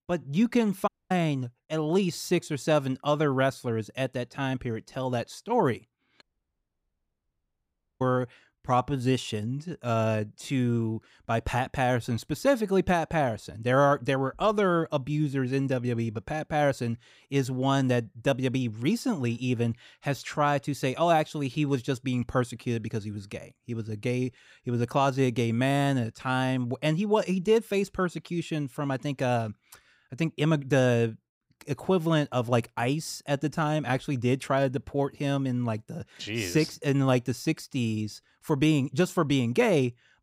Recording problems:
audio cutting out; at 1 s and at 6 s for 2 s

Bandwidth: 15.5 kHz